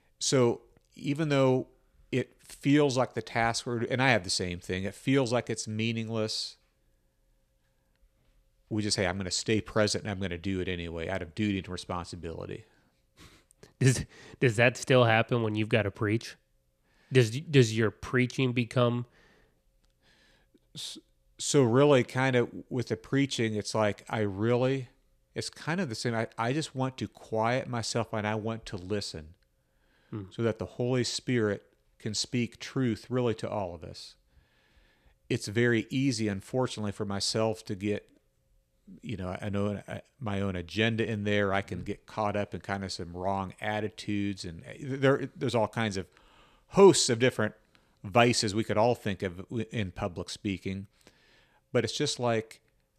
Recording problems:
none

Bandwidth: 14.5 kHz